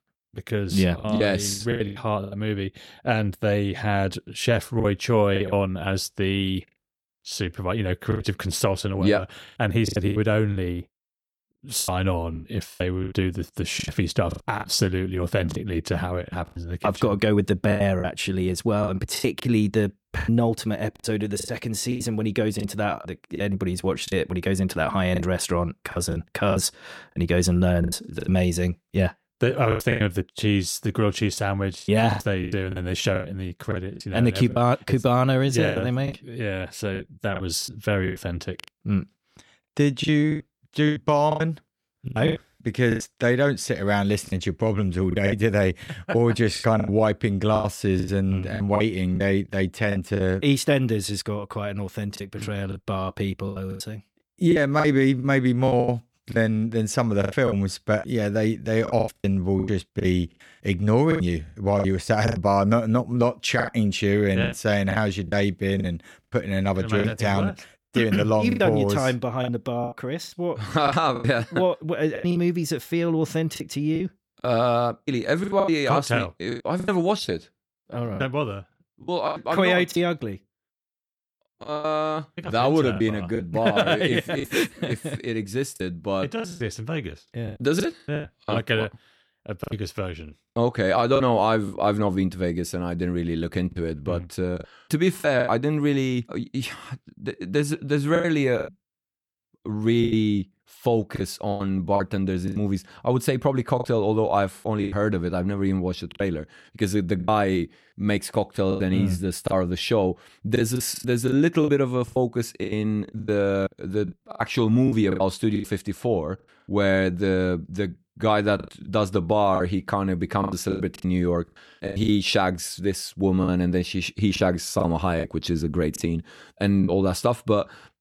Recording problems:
choppy; very; 10% of the speech affected

